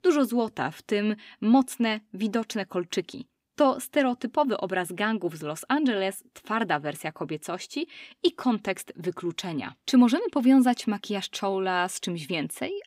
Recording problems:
none

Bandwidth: 15.5 kHz